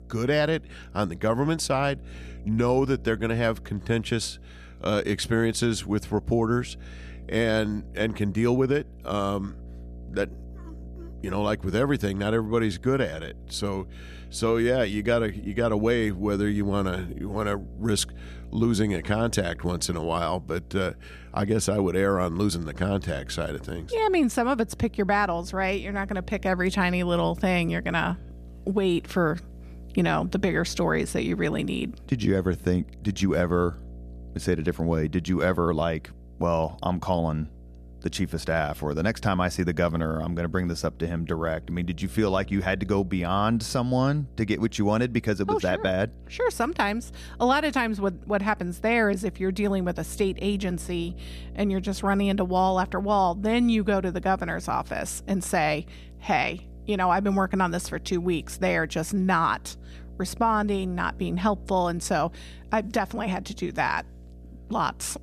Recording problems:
electrical hum; faint; throughout; 60 Hz, 25 dB below the speech

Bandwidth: 14.5 kHz